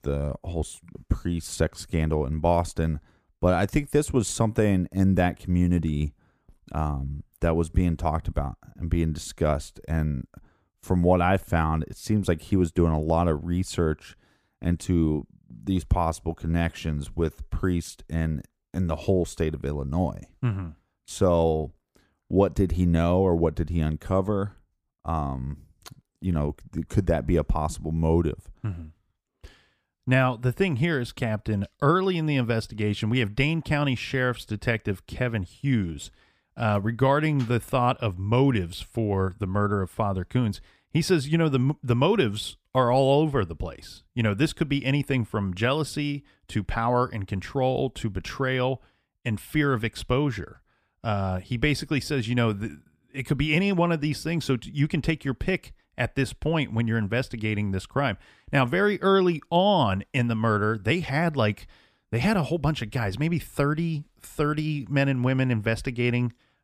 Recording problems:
none

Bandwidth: 15 kHz